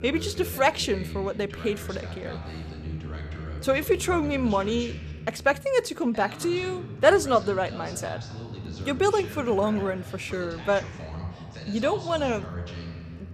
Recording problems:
voice in the background; noticeable; throughout; 10 dB below the speech

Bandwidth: 14.5 kHz